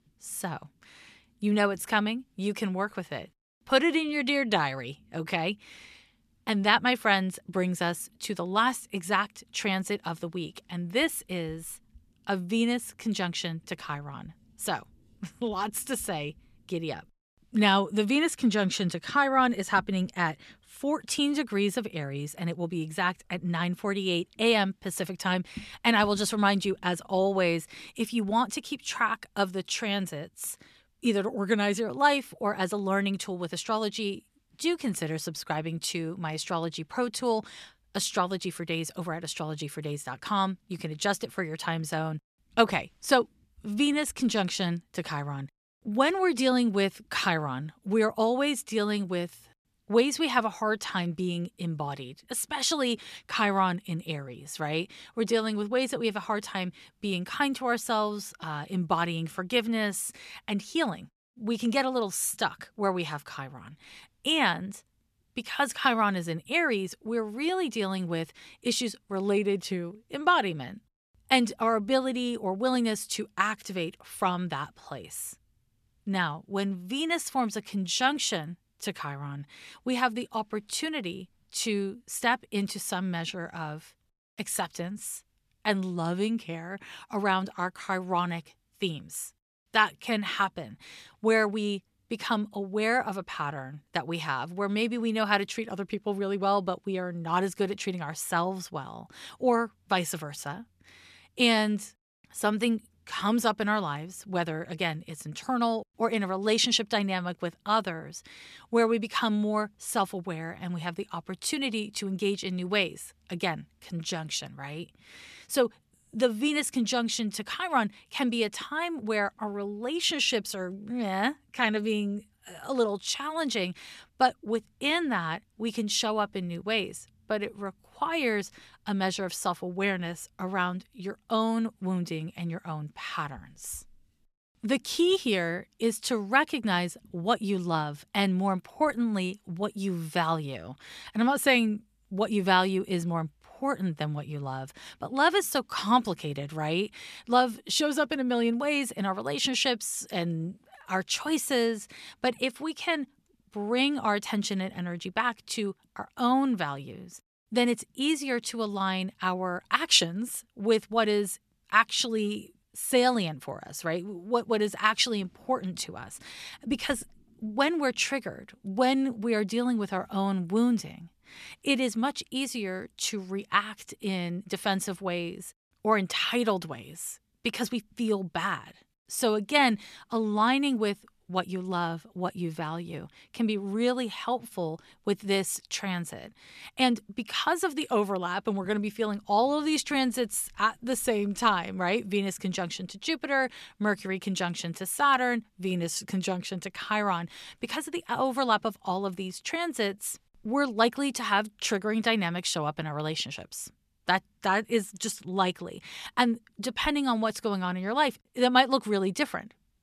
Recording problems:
none

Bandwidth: 14 kHz